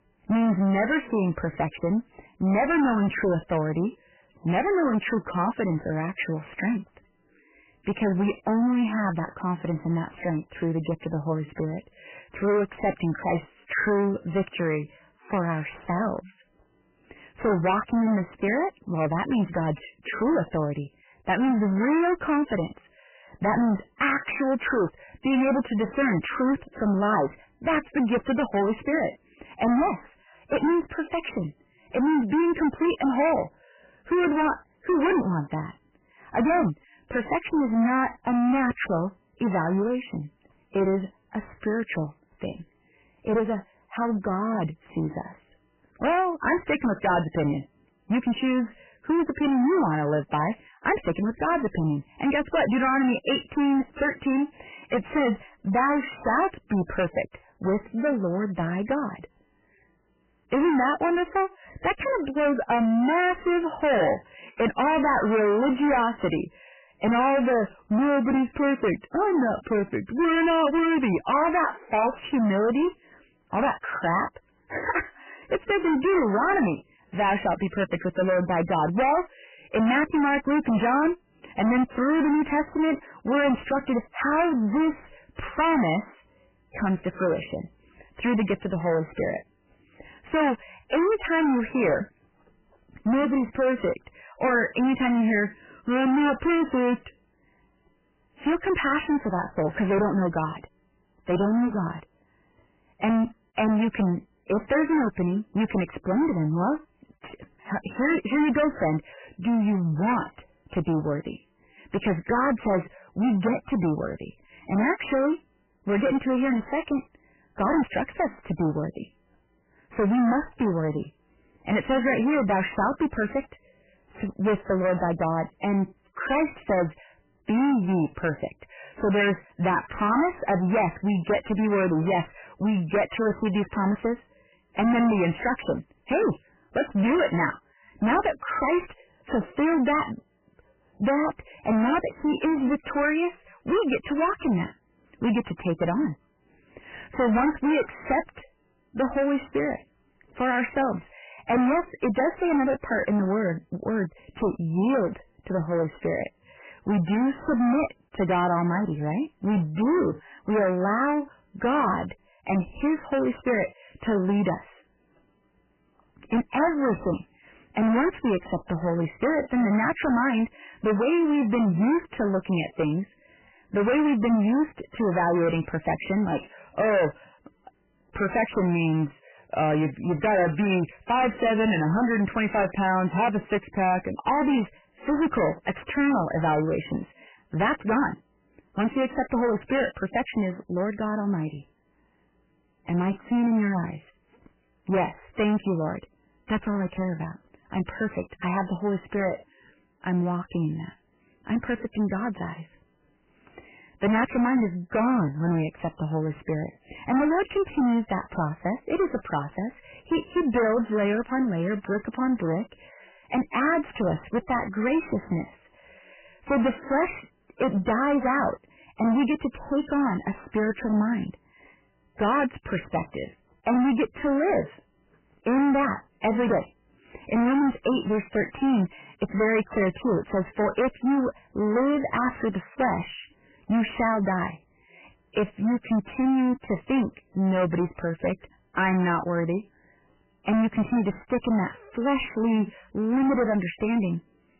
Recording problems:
distortion; heavy; 18% of the sound clipped
garbled, watery; badly; nothing above 3 kHz

